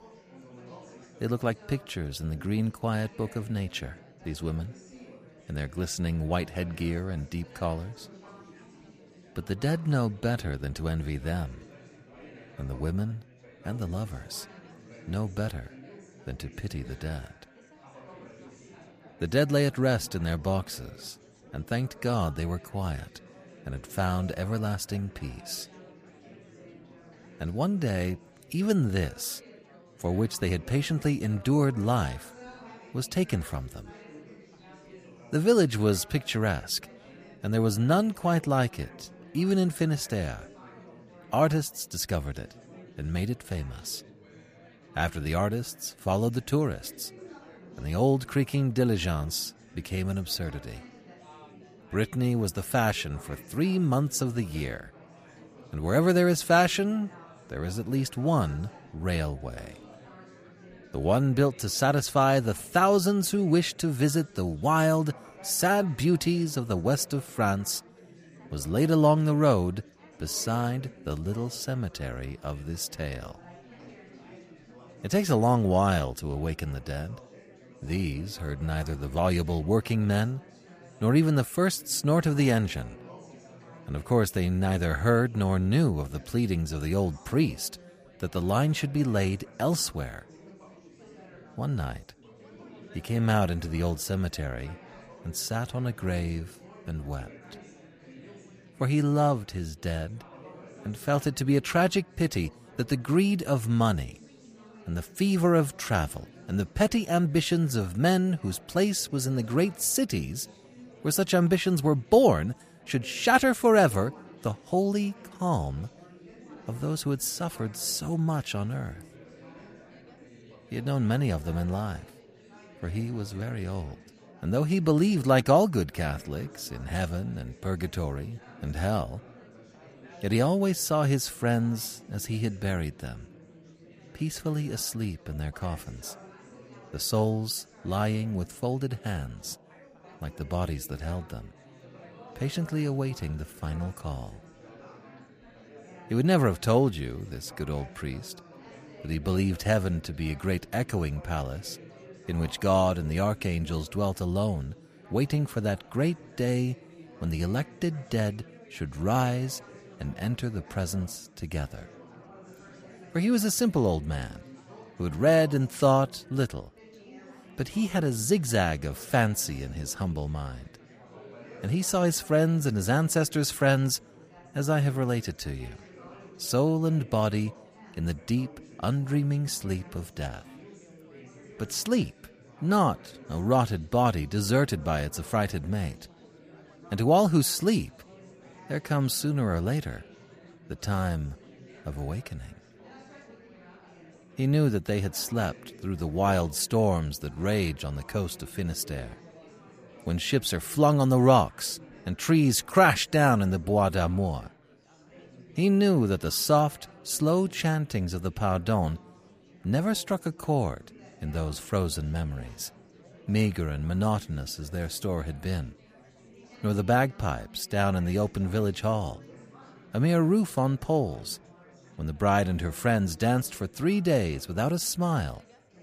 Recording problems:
chatter from many people; faint; throughout; 25 dB below the speech

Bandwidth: 15 kHz